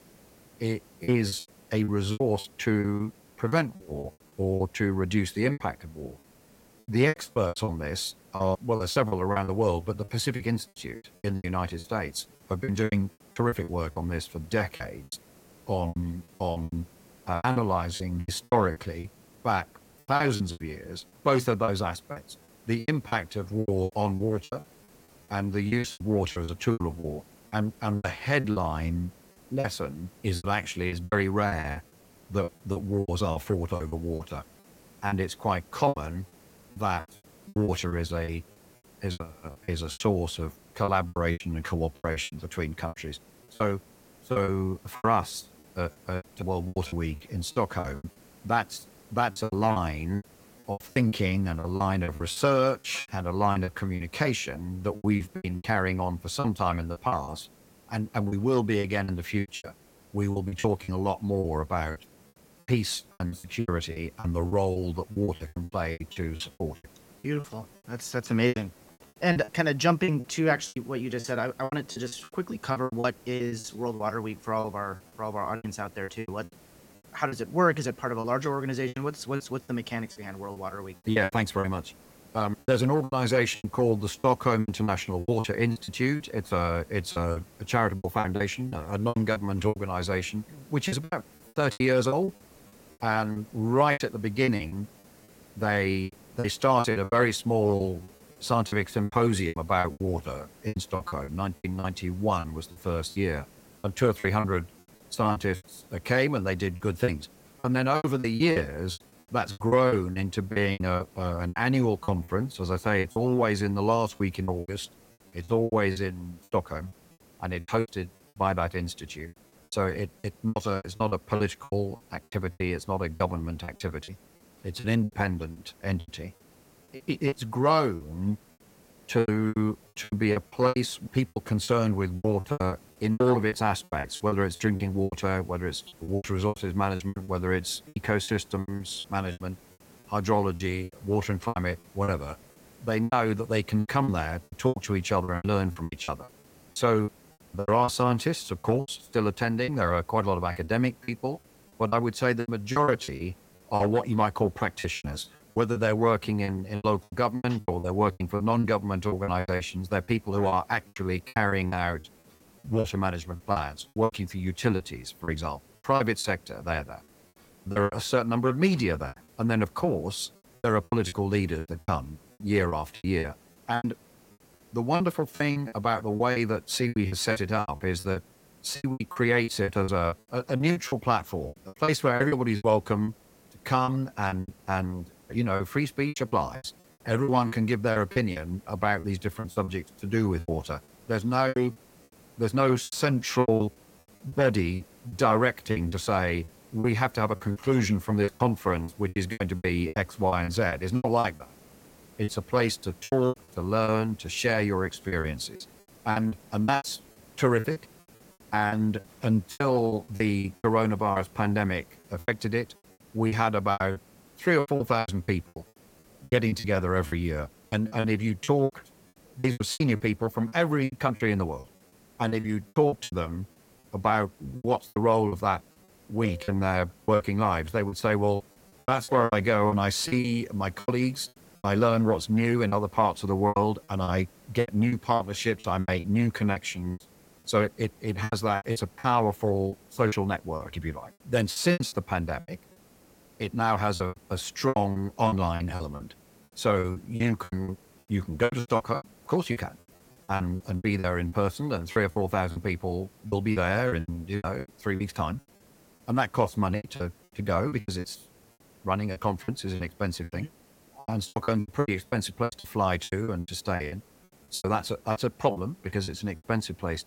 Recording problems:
hiss; faint; throughout; 25 dB below the speech
choppy; very; 16% of the speech affected

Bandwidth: 16.5 kHz